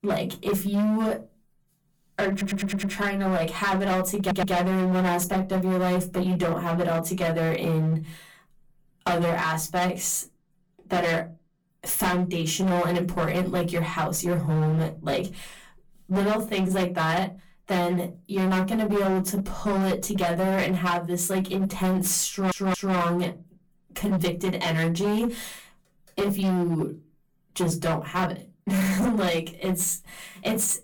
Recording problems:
distortion; heavy; 18% of the sound clipped
off-mic speech; far
room echo; very slight; dies away in 0.2 s
audio stuttering; at 2.5 s, at 4 s and at 22 s

